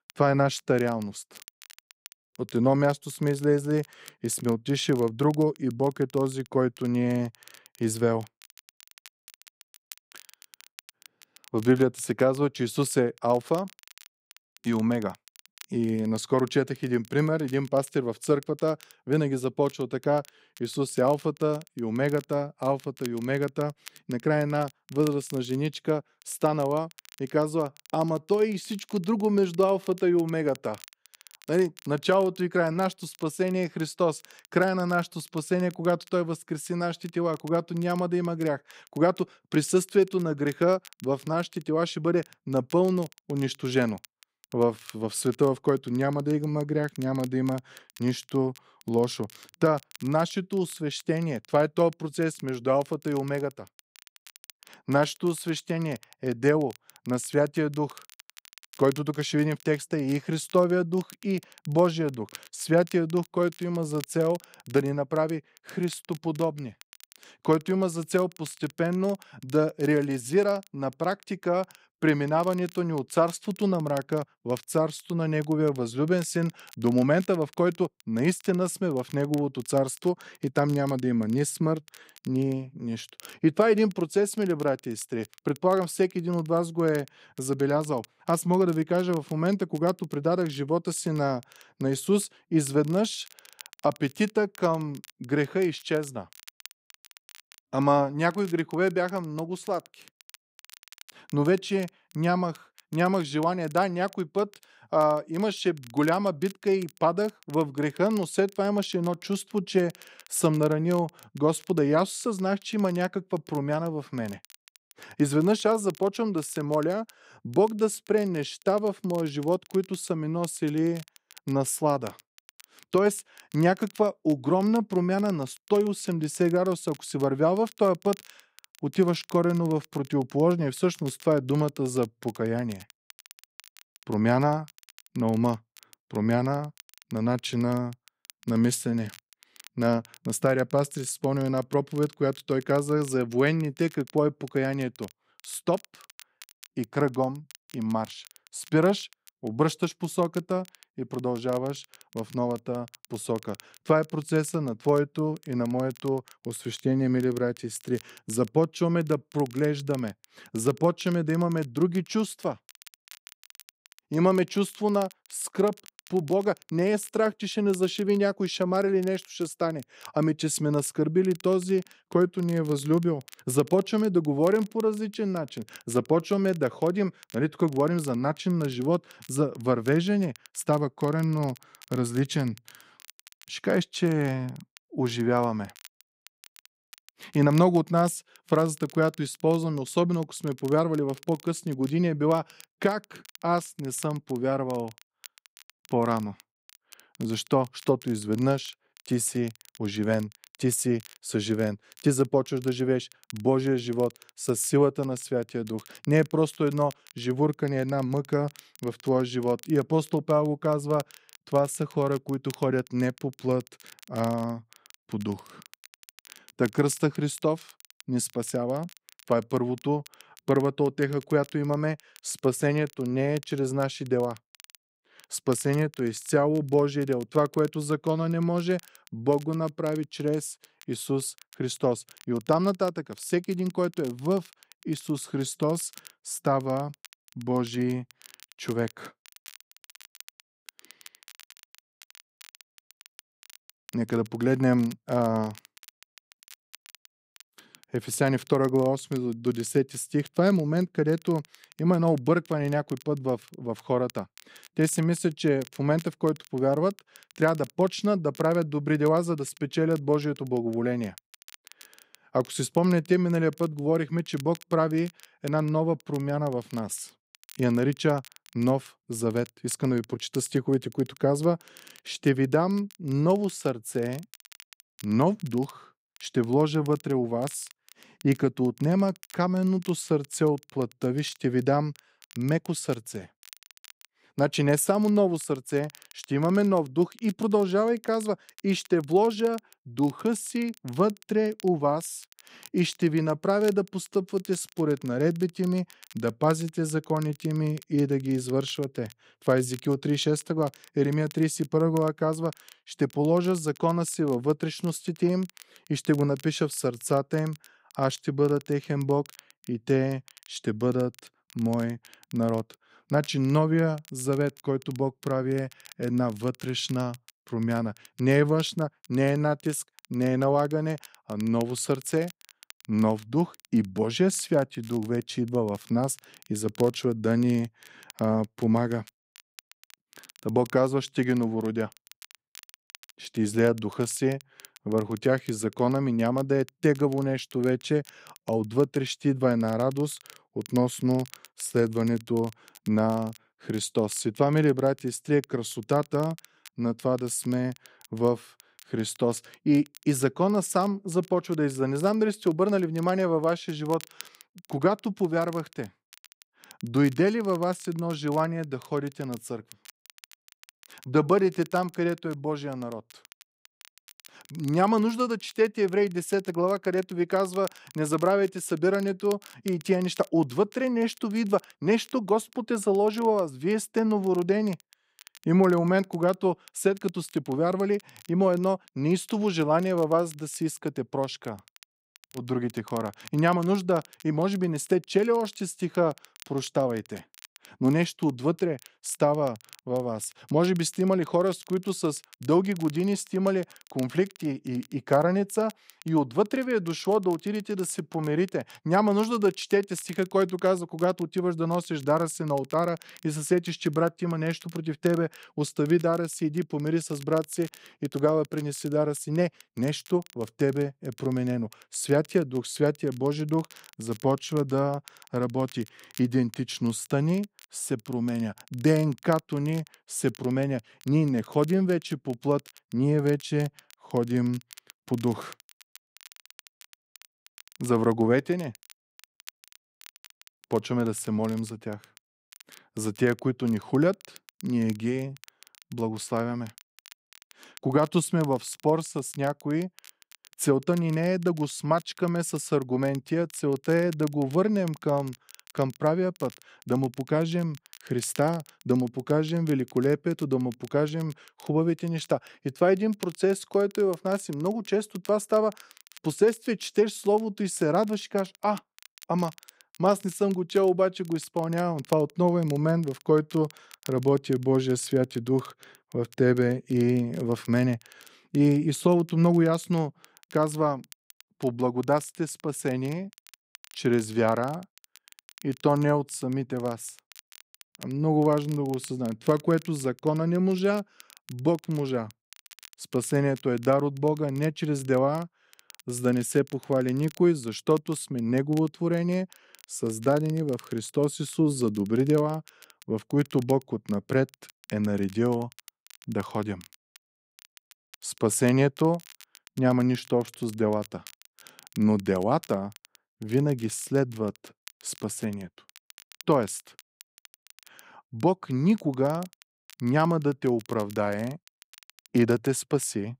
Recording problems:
crackle, like an old record; faint; 25 dB below the speech

